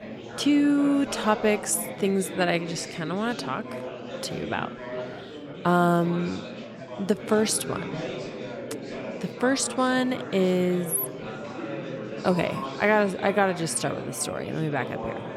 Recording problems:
chatter from many people; noticeable; throughout; 10 dB below the speech

